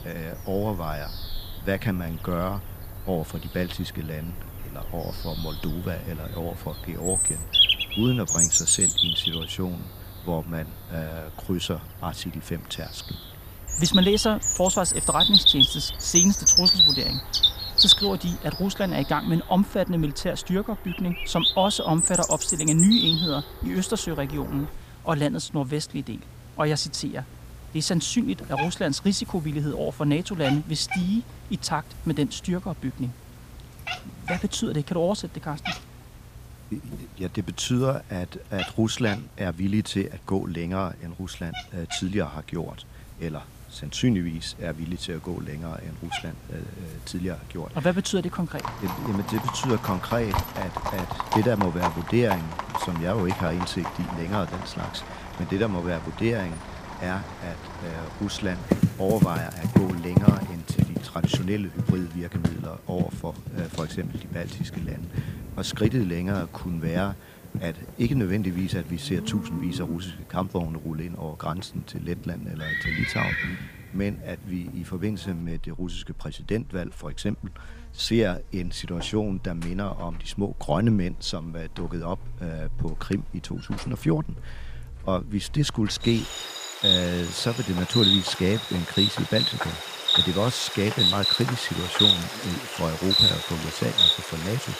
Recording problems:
animal sounds; very loud; throughout; 4 dB above the speech

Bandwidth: 15 kHz